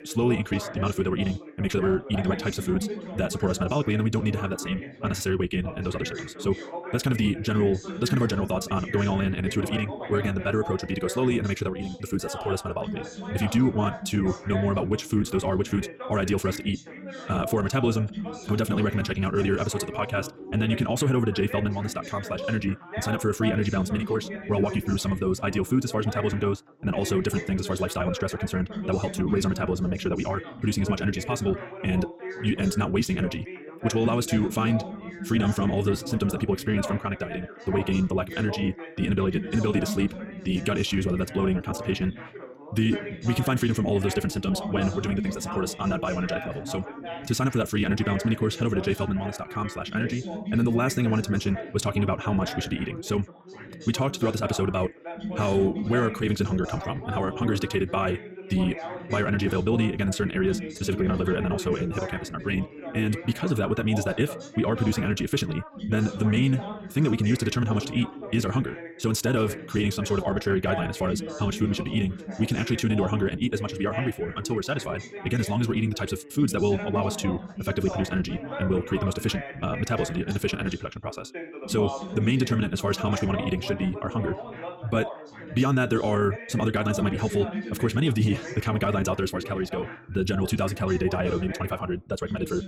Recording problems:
wrong speed, natural pitch; too fast; 1.8 times normal speed
background chatter; loud; throughout; 3 voices, 10 dB below the speech

